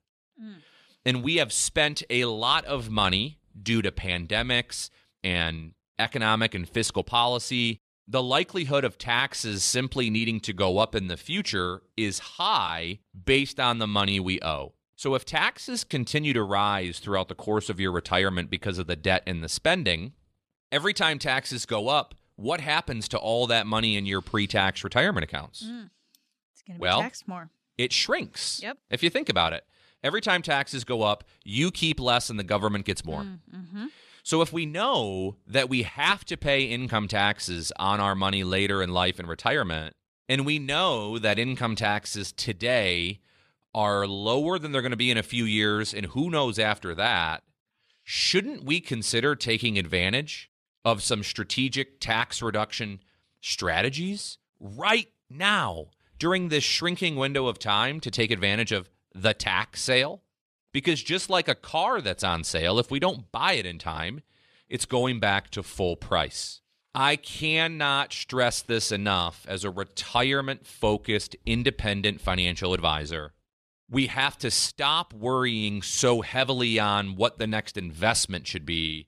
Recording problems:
none

